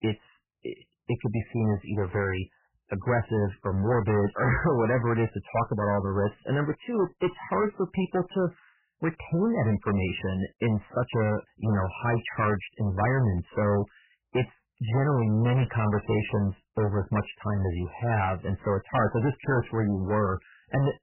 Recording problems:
distortion; heavy; 13% of the sound clipped
garbled, watery; badly; nothing above 3 kHz

